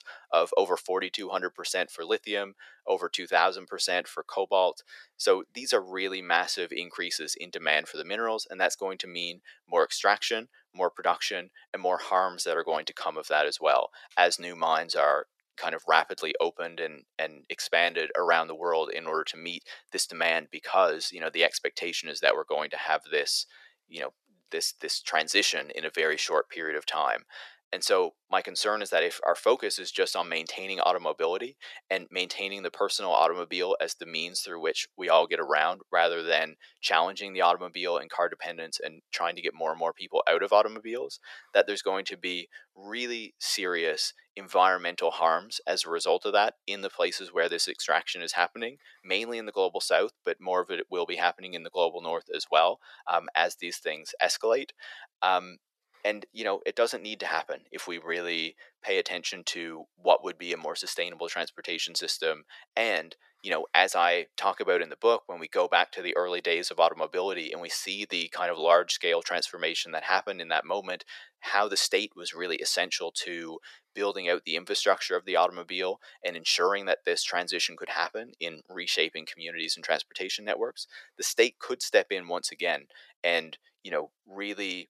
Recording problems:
thin; very; fading below 500 Hz

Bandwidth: 13.5 kHz